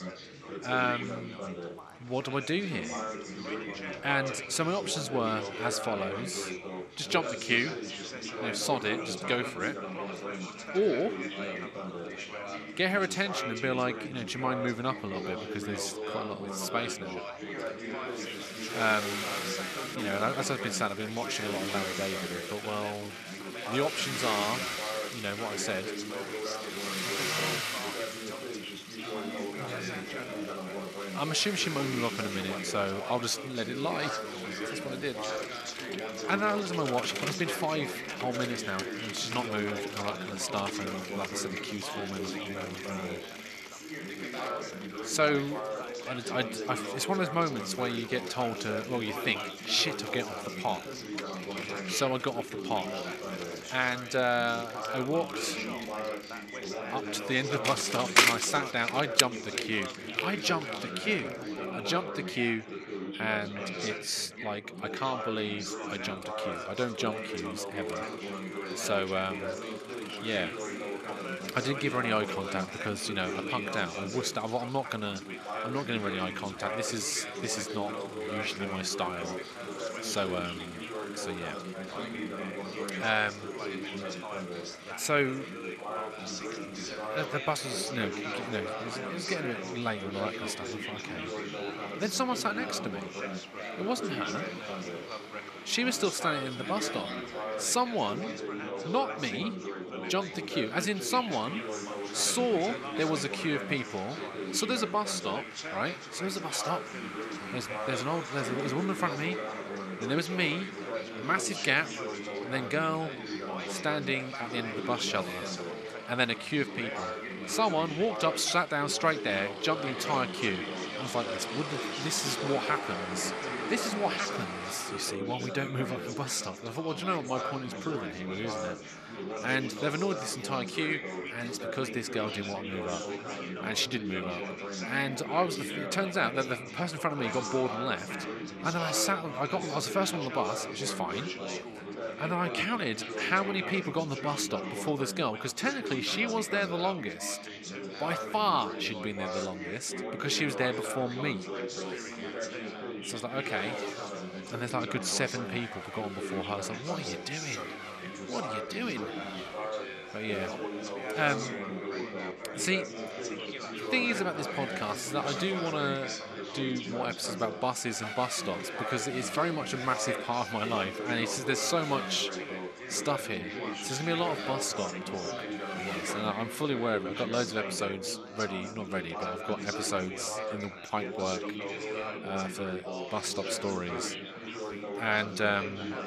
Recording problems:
thin; somewhat; fading below 900 Hz
traffic noise; loud; throughout; 8 dB below the speech
chatter from many people; loud; throughout; 5 dB below the speech

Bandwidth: 13.5 kHz